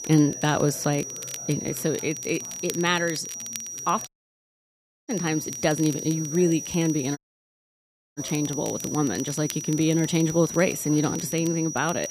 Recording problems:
high-pitched whine; loud; throughout; 6 kHz, 7 dB below the speech
crackle, like an old record; noticeable; 20 dB below the speech
chatter from many people; faint; throughout; 25 dB below the speech
hiss; faint; throughout; 25 dB below the speech
audio cutting out; at 4 s for 1 s and at 7 s for 1 s

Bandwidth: 15 kHz